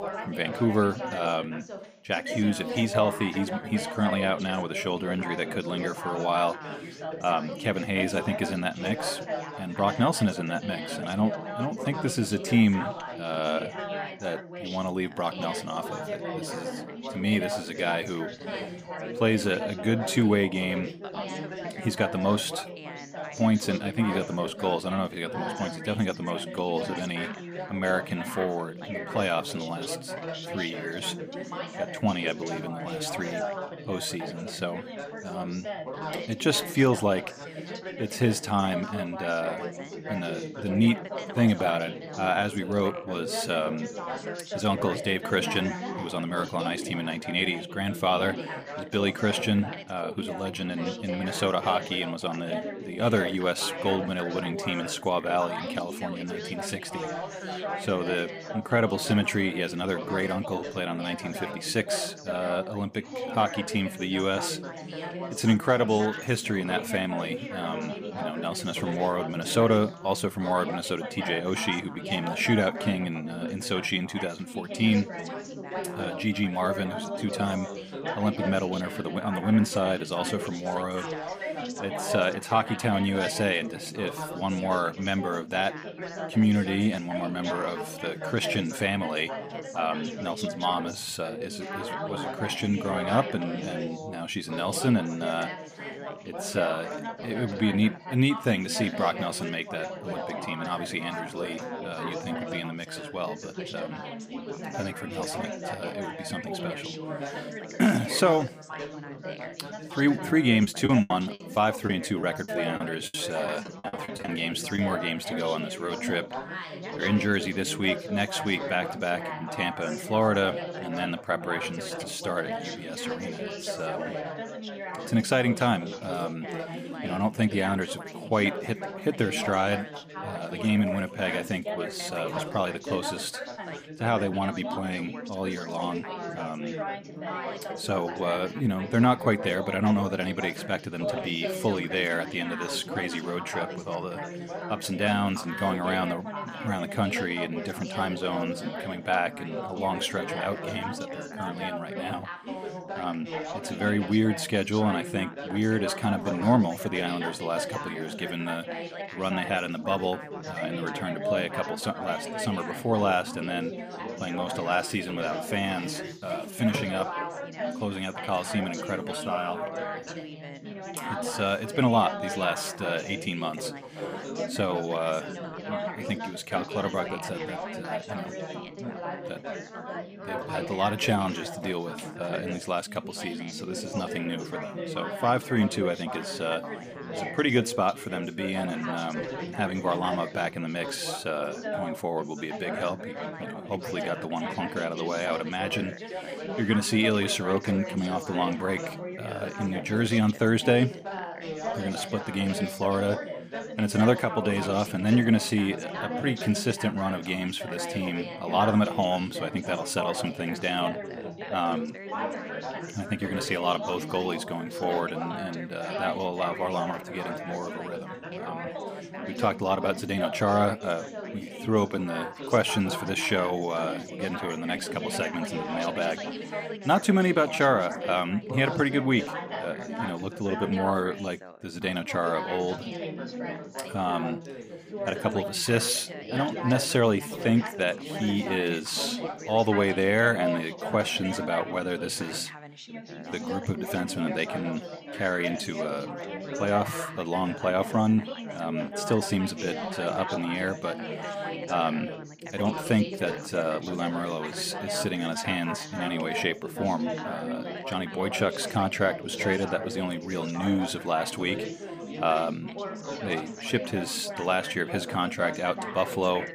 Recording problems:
background chatter; loud; throughout; 4 voices, 7 dB below the speech
choppy; very; from 1:51 to 1:55; 14% of the speech affected

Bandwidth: 15 kHz